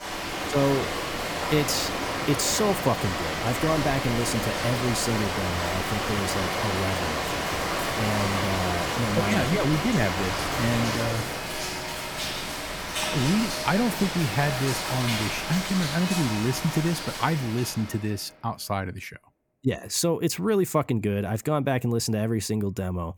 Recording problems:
rain or running water; loud; until 17 s; 1 dB below the speech

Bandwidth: 18.5 kHz